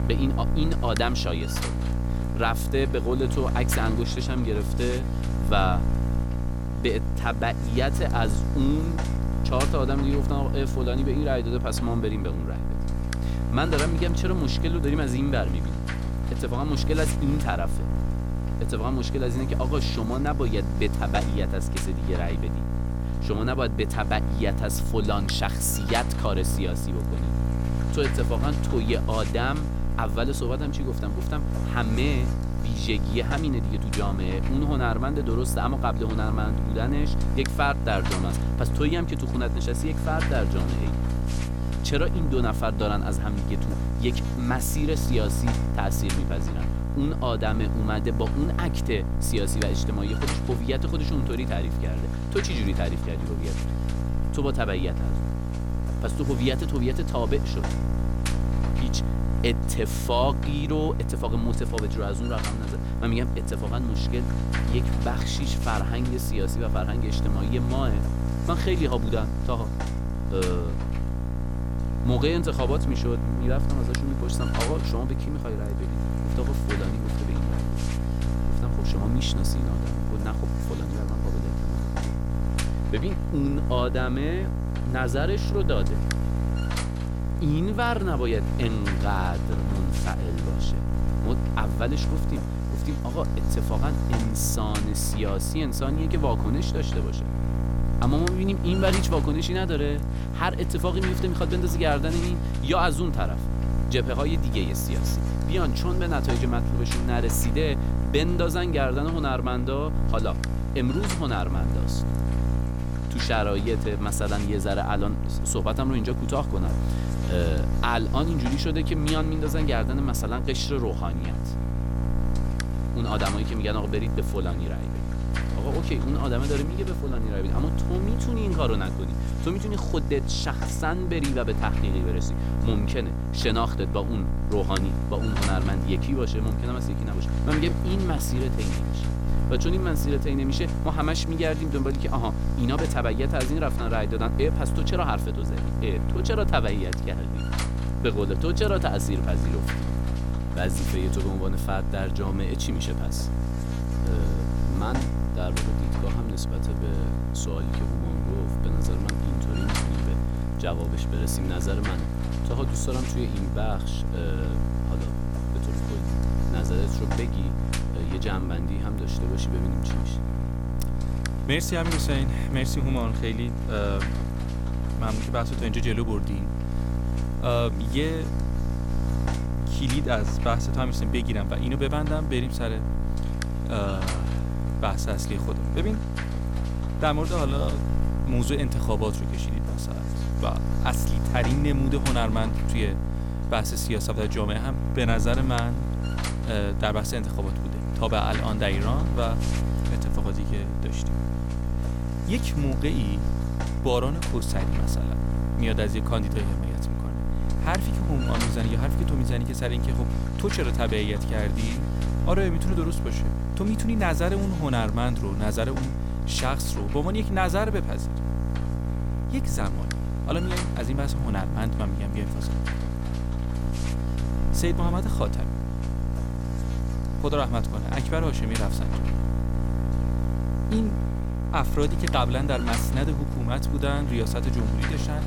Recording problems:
electrical hum; loud; throughout; 60 Hz, 5 dB below the speech

